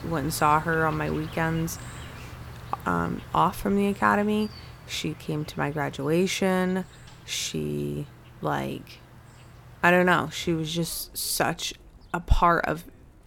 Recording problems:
animal sounds; noticeable; throughout; 20 dB below the speech

